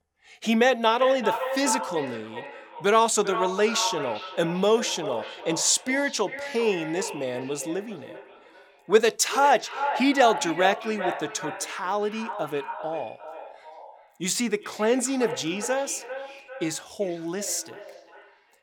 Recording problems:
echo of what is said; strong; throughout; 390 ms later, 9 dB below the speech

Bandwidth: 18 kHz